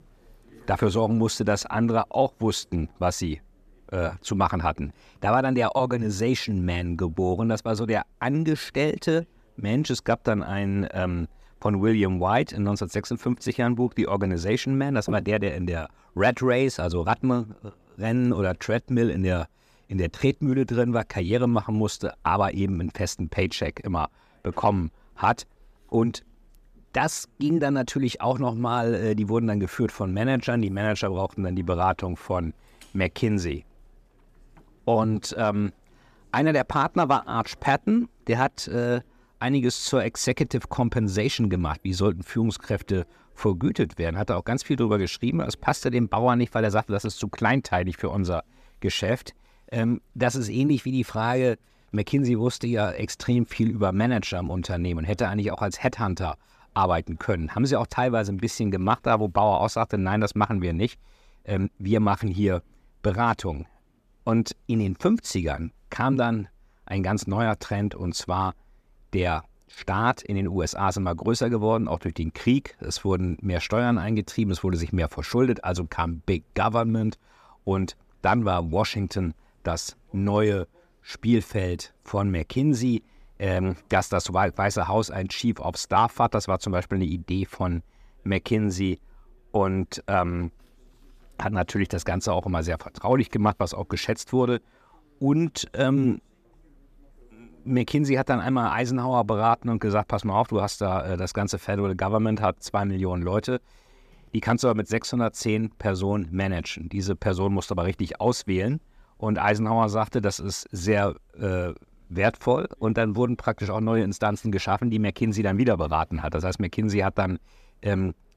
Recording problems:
none

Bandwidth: 14.5 kHz